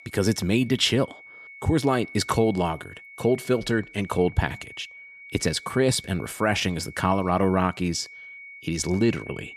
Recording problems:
high-pitched whine; noticeable; throughout; 2 kHz, 20 dB below the speech

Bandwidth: 13.5 kHz